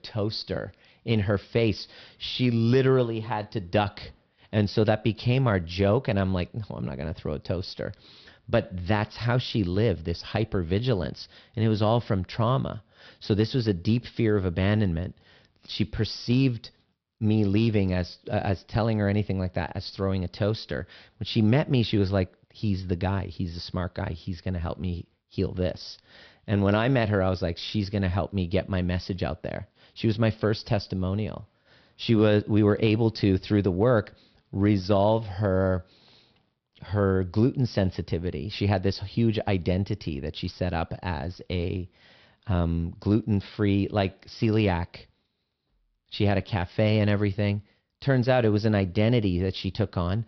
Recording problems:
high frequencies cut off; noticeable; nothing above 5.5 kHz

